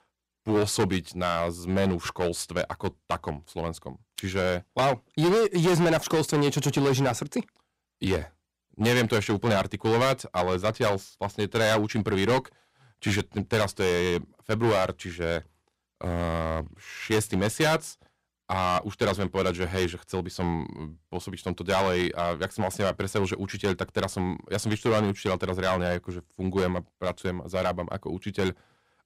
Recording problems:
distortion; heavy; 8% of the sound clipped

